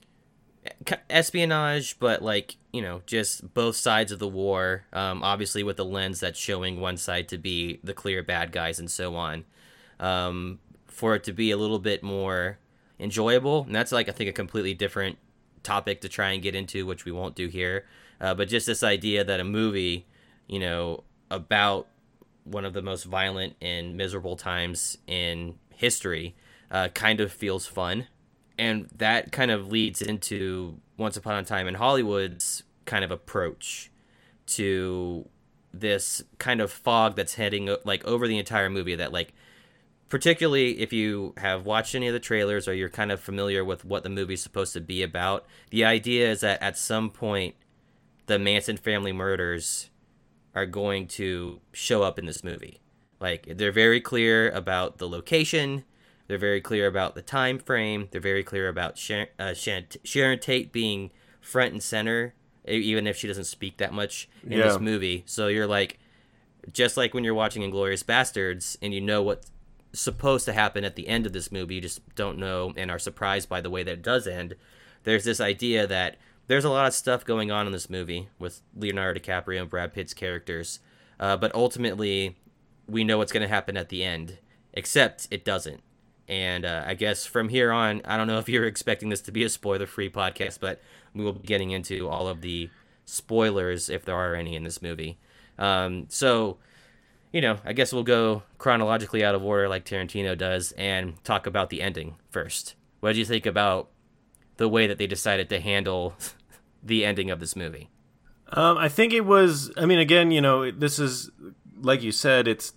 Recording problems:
choppy; very; from 30 to 32 s, from 51 to 53 s and from 1:30 to 1:32; 7% of the speech affected

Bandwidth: 16.5 kHz